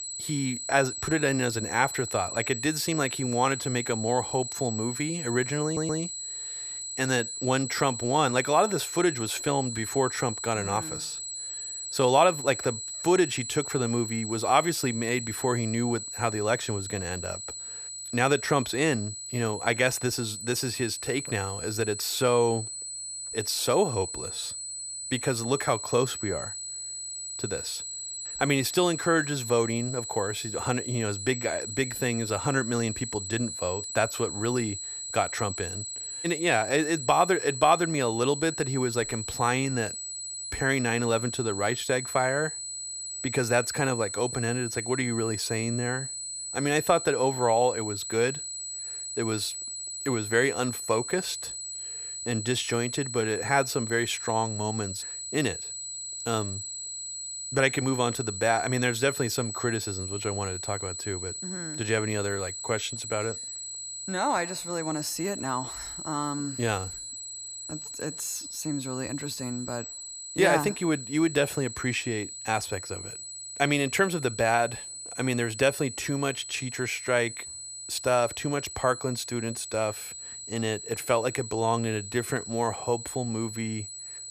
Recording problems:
high-pitched whine; loud; throughout; 8 kHz, 6 dB below the speech
audio stuttering; at 5.5 s

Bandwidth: 14.5 kHz